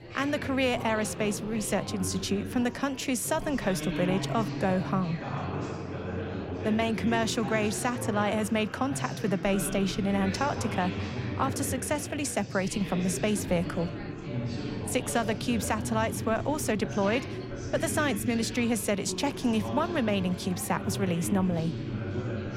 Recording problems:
chatter from many people; loud; throughout; 6 dB below the speech

